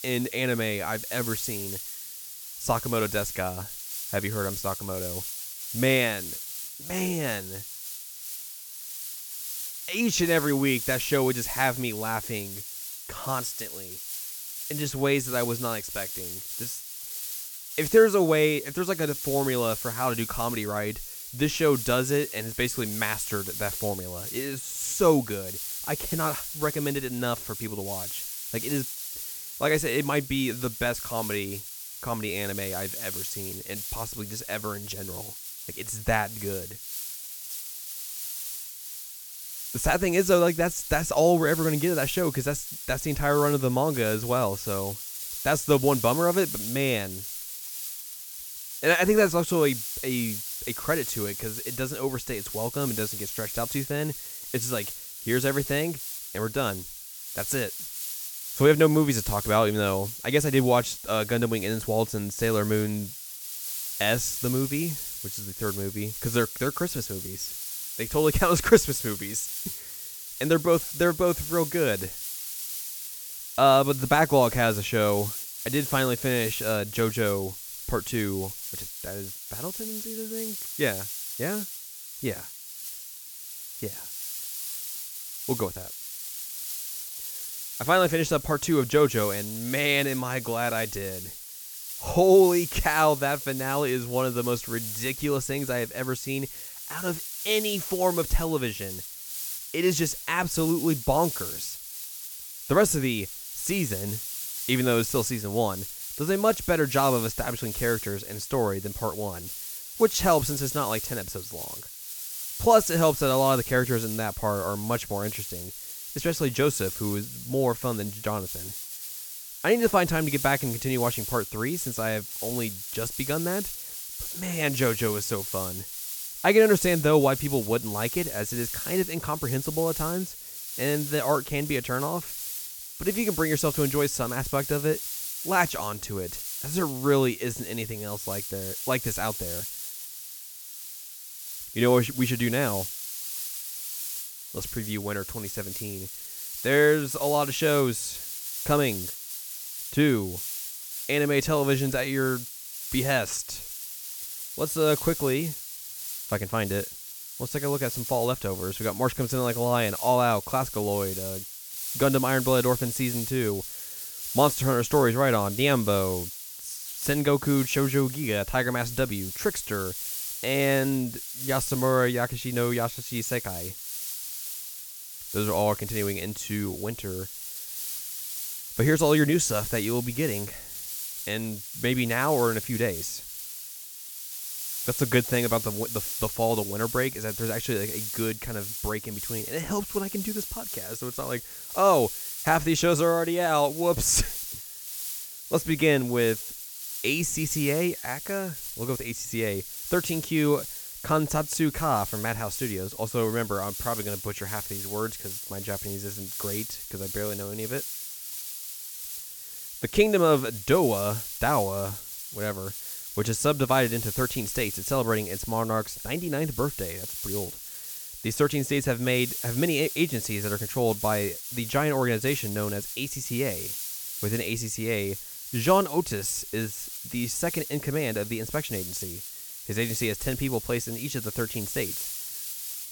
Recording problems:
hiss; loud; throughout; 7 dB below the speech

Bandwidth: 18 kHz